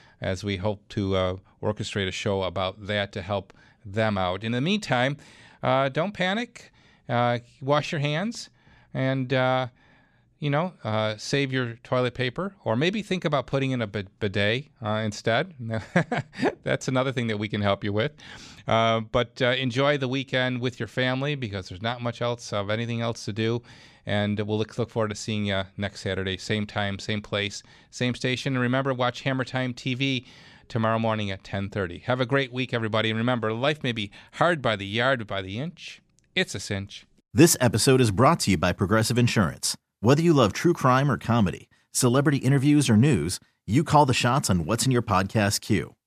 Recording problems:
none

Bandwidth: 14.5 kHz